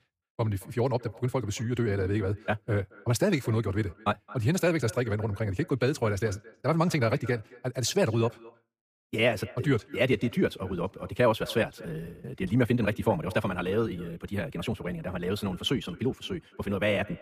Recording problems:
wrong speed, natural pitch; too fast; 1.6 times normal speed
echo of what is said; faint; throughout; 220 ms later, 20 dB below the speech

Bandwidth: 15 kHz